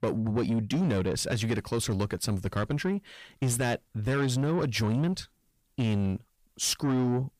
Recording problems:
distortion; slight; 10 dB below the speech

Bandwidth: 15 kHz